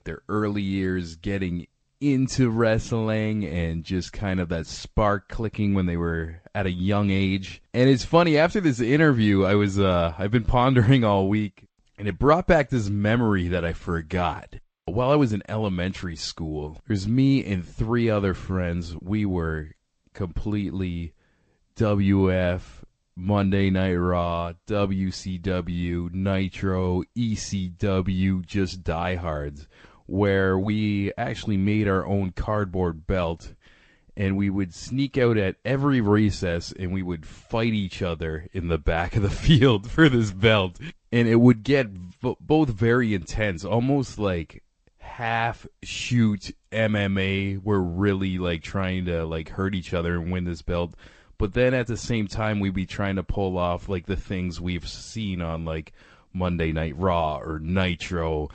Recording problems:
garbled, watery; slightly; nothing above 8 kHz

